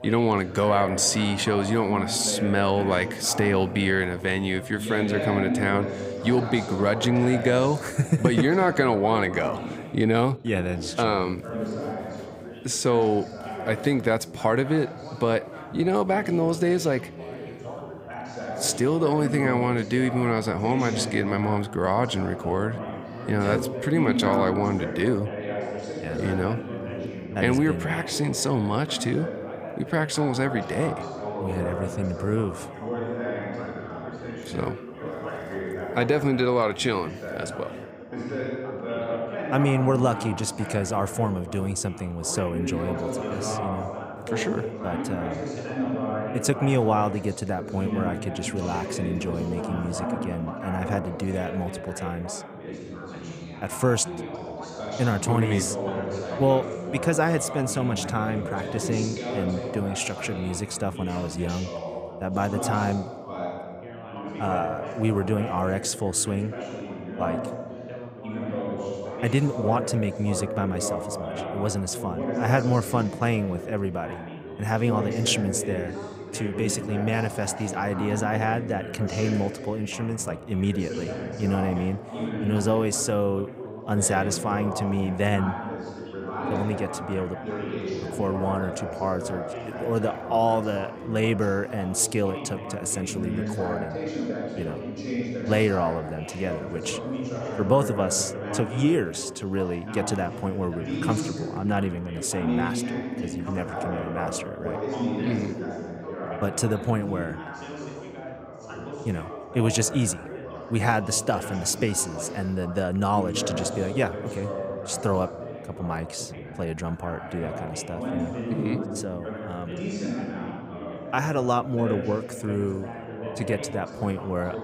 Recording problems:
background chatter; loud; throughout; 3 voices, 7 dB below the speech

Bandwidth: 15.5 kHz